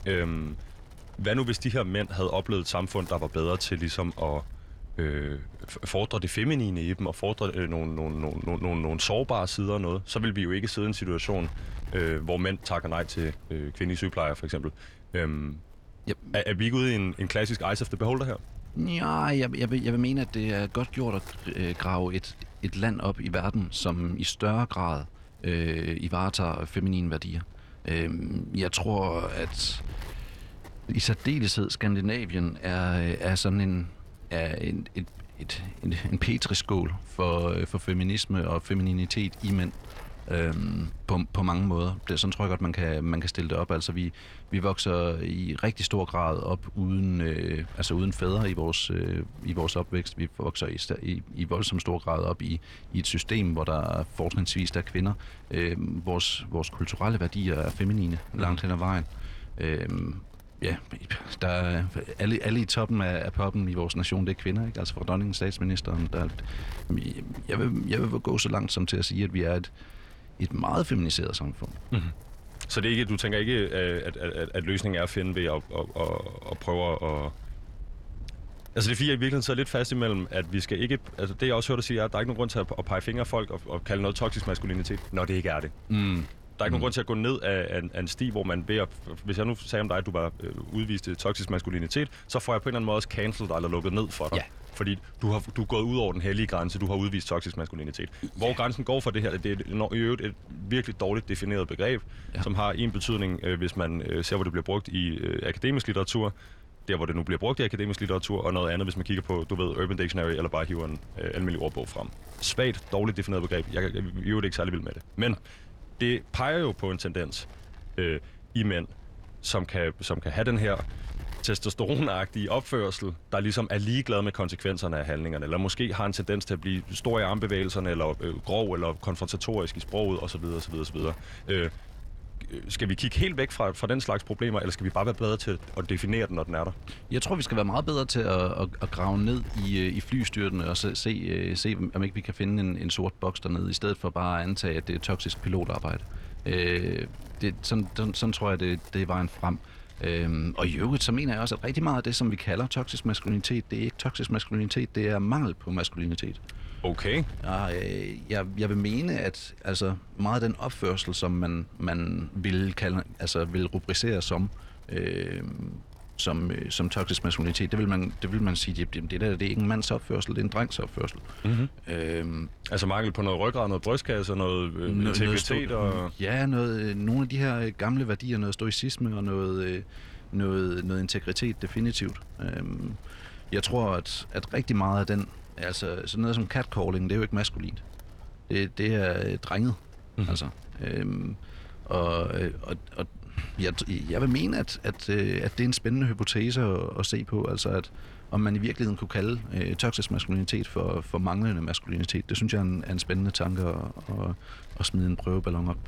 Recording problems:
wind noise on the microphone; occasional gusts; 25 dB below the speech
uneven, jittery; strongly; from 28 s to 3:06

